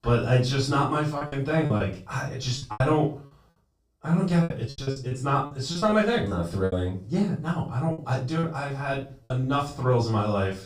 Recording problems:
off-mic speech; far
room echo; slight; dies away in 0.3 s
choppy; very; from 1 to 3 s, from 4.5 to 6.5 s and from 8 to 9.5 s; 13% of the speech affected

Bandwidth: 15 kHz